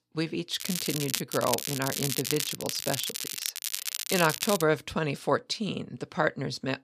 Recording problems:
crackling; loud; at 0.5 s and from 1.5 to 4.5 s; 2 dB below the speech

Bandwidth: 14.5 kHz